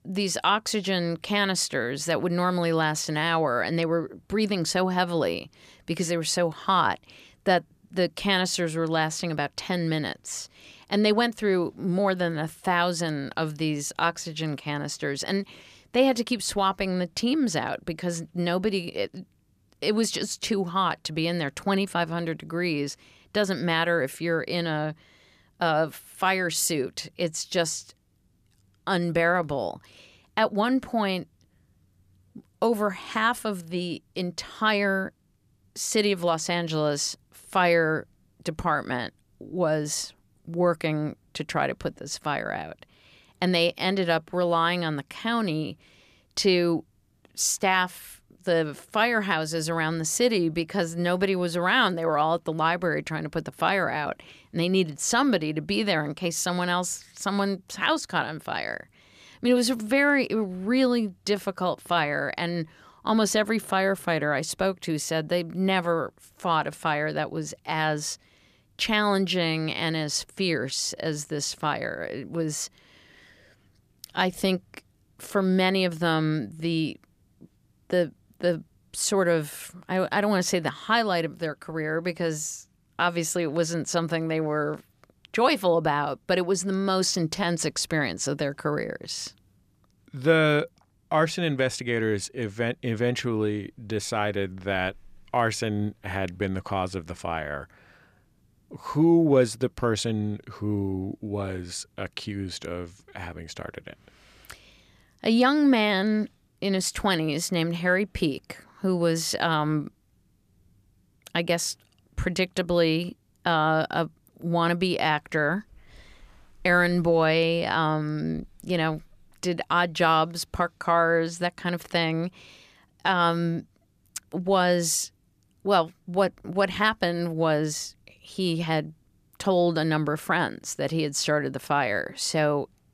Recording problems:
none

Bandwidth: 14.5 kHz